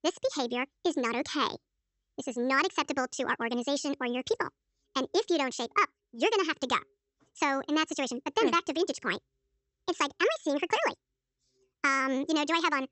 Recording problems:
wrong speed and pitch; too fast and too high; 1.5 times normal speed
high frequencies cut off; noticeable; nothing above 8 kHz

